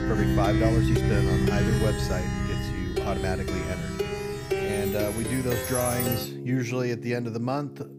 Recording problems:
background music; very loud; throughout; 3 dB above the speech

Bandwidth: 15 kHz